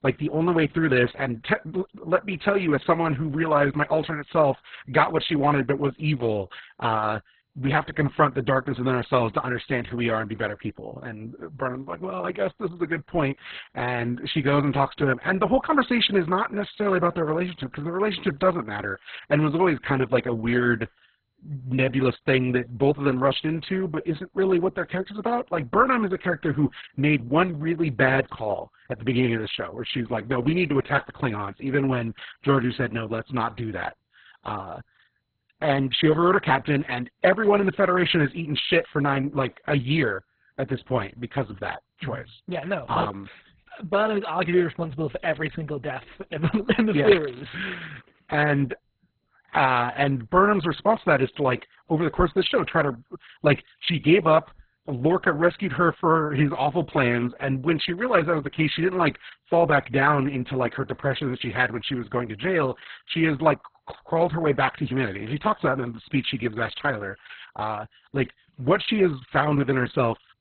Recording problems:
garbled, watery; badly; nothing above 4 kHz

